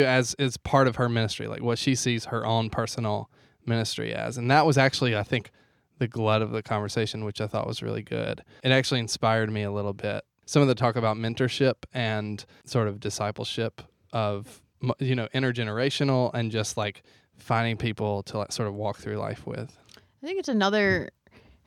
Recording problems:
abrupt cut into speech; at the start

